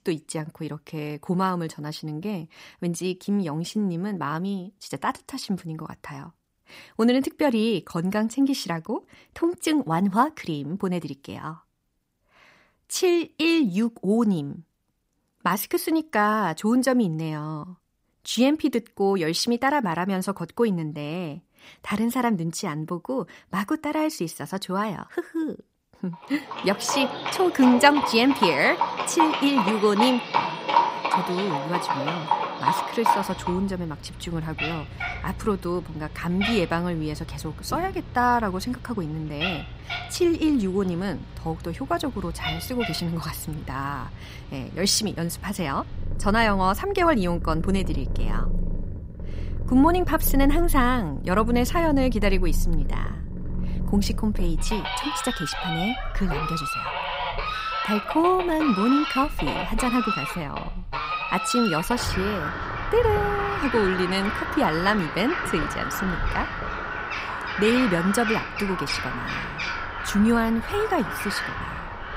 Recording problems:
animal sounds; loud; from 27 s on; 4 dB below the speech

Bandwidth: 15.5 kHz